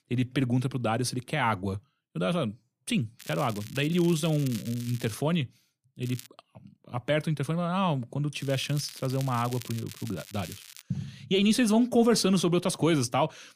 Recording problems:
crackling; noticeable; from 3 to 5 s, at 6 s and from 8.5 to 11 s; 15 dB below the speech

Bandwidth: 15 kHz